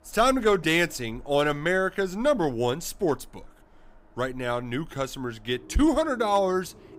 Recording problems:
animal sounds; faint; throughout; 25 dB below the speech

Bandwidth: 15.5 kHz